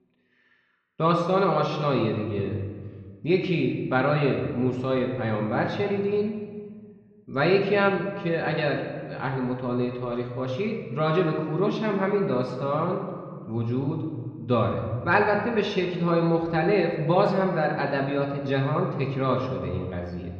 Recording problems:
room echo; noticeable; dies away in 1.4 s
muffled; slightly; fading above 4 kHz
off-mic speech; somewhat distant

